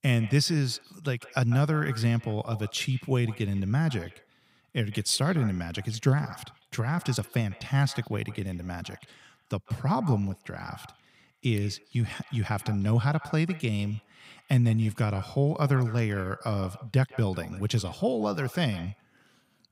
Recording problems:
echo of what is said; faint; throughout; 150 ms later, 20 dB below the speech

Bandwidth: 15.5 kHz